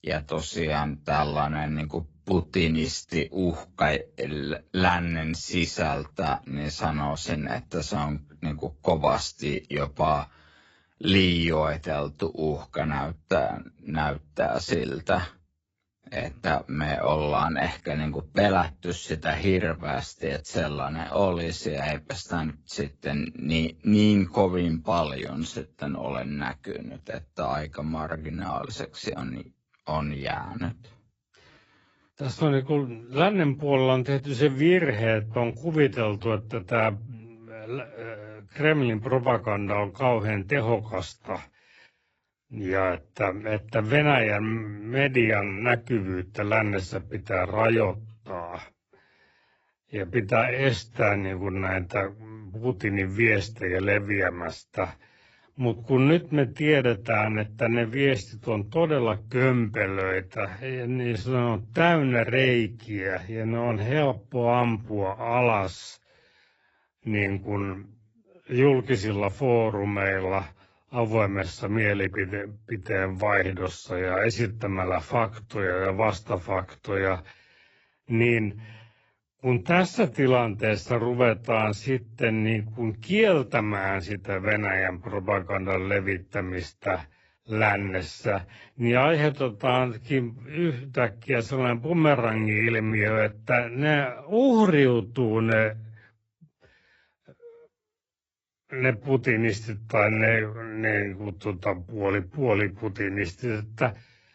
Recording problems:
garbled, watery; badly; nothing above 7.5 kHz
wrong speed, natural pitch; too slow; 0.6 times normal speed

